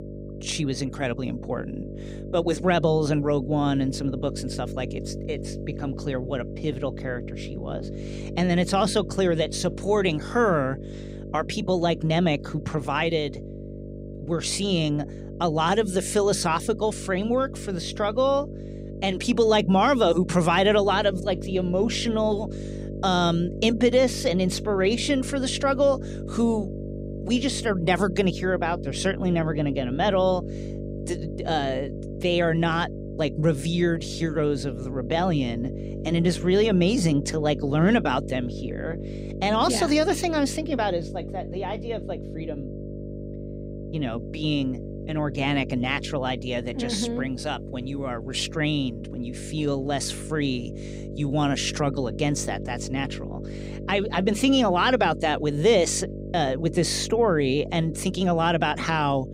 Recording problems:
electrical hum; noticeable; throughout; 50 Hz, 15 dB below the speech

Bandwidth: 15.5 kHz